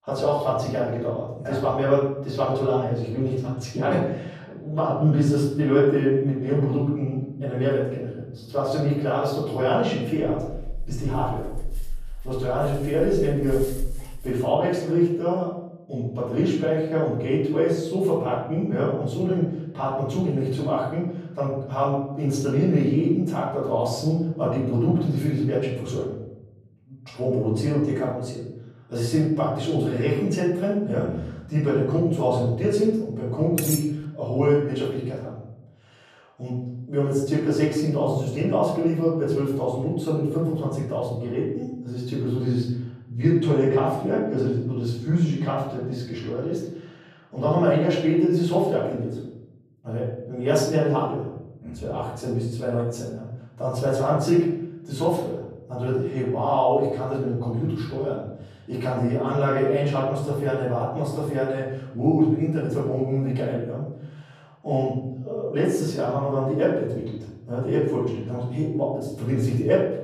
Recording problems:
off-mic speech; far
room echo; noticeable; dies away in 0.9 s
dog barking; faint; from 10 to 14 s; peak 10 dB below the speech
clattering dishes; noticeable; at 34 s; peak 3 dB below the speech

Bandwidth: 14.5 kHz